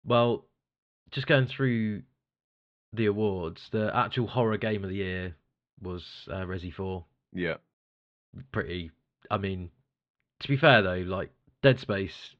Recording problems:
muffled; slightly; fading above 3.5 kHz

